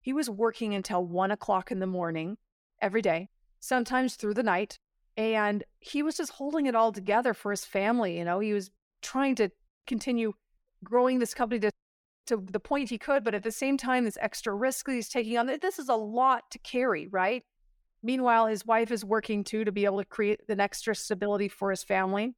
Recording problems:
none

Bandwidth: 17.5 kHz